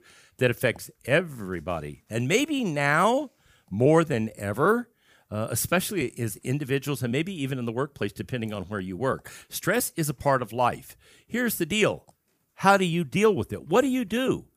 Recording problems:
none

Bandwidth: 15 kHz